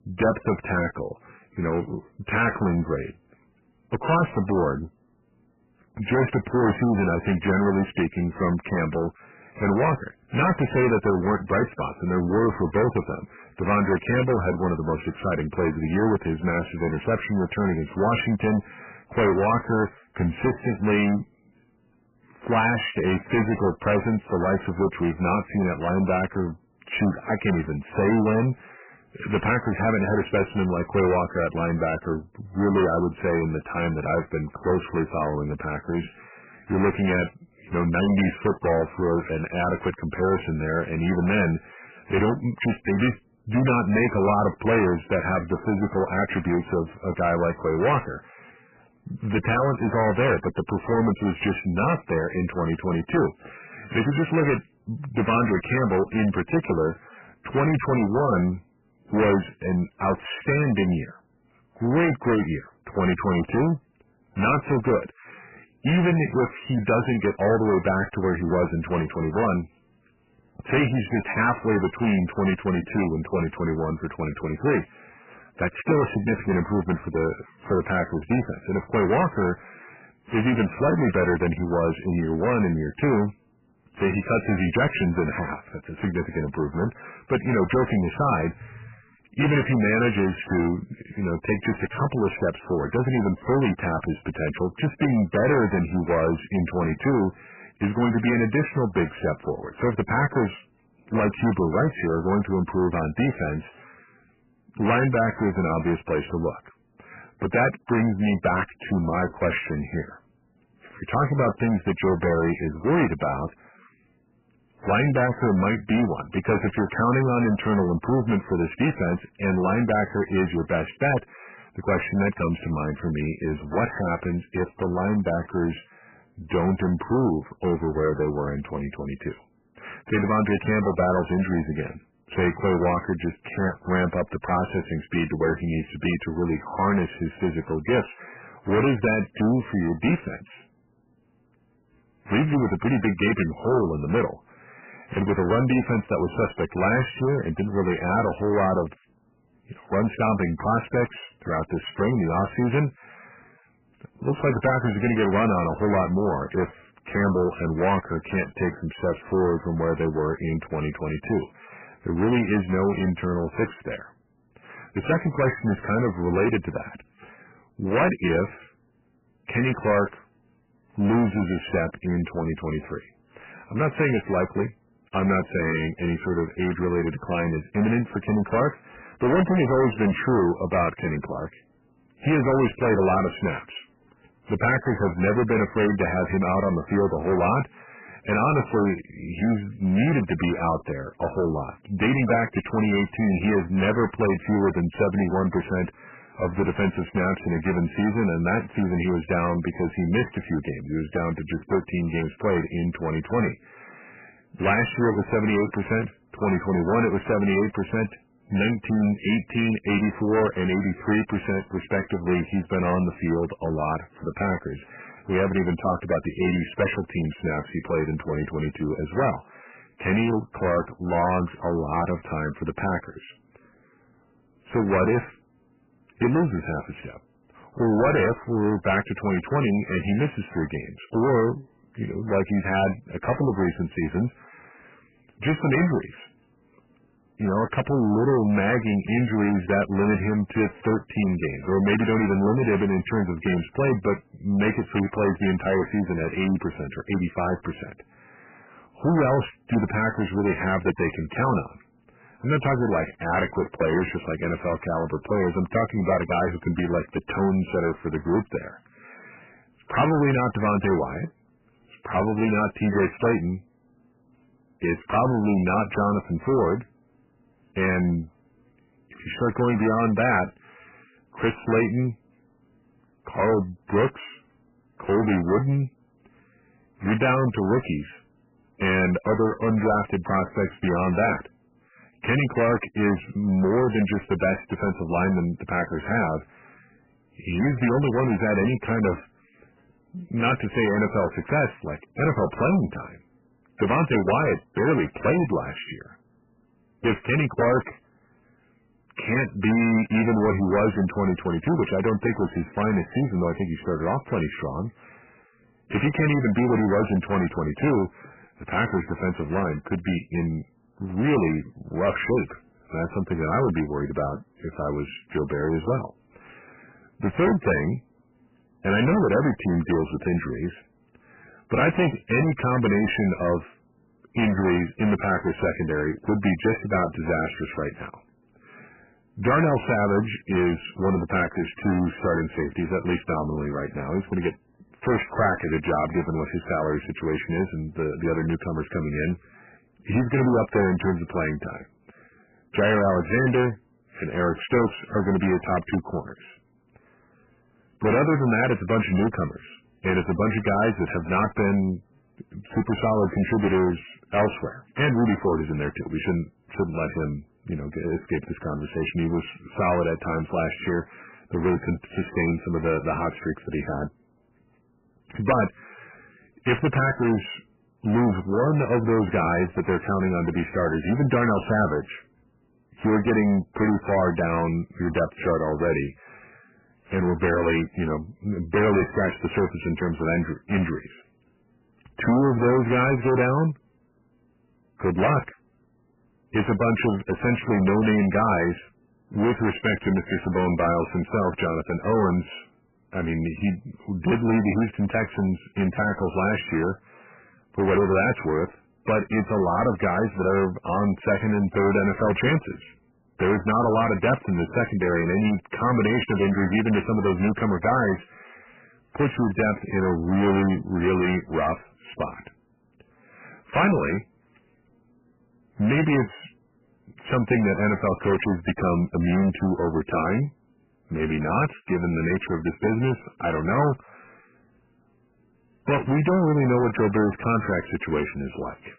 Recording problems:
distortion; heavy; 11% of the sound clipped
garbled, watery; badly; nothing above 3 kHz

